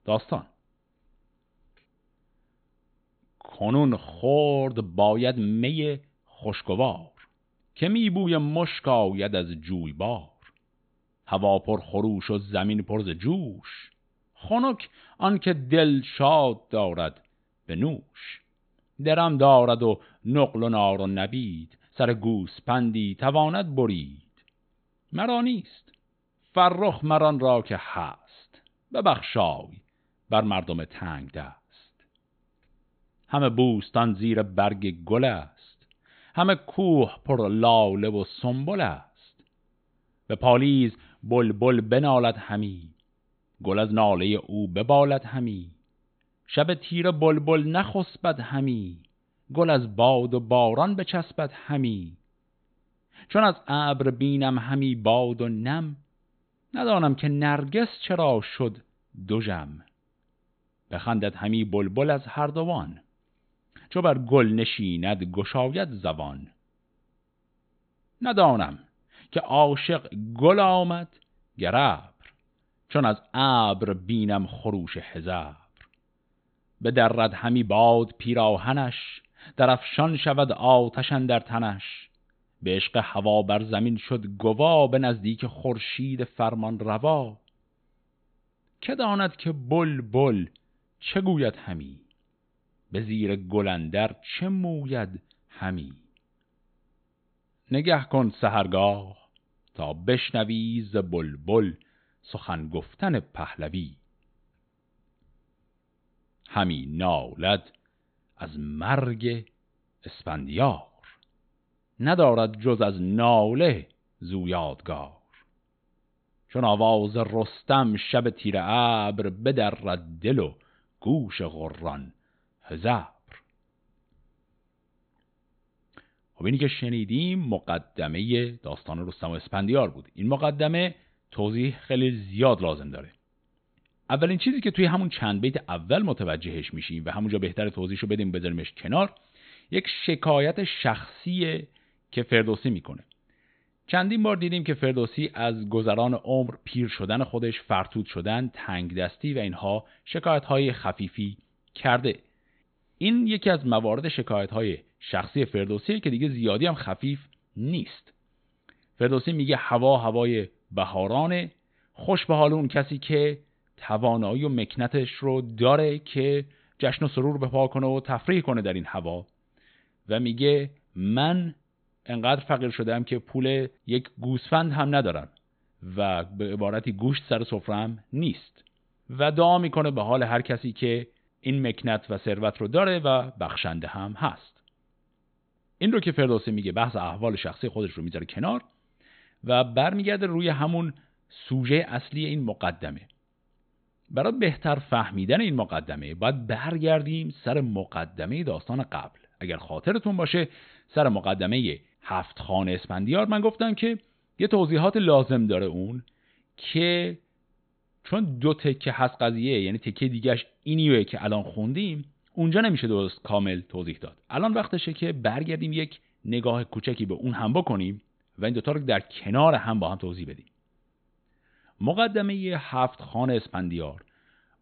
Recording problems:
high frequencies cut off; severe; nothing above 4 kHz

